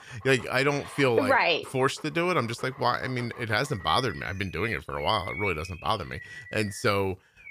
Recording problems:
animal sounds; noticeable; throughout; 15 dB below the speech

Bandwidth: 15 kHz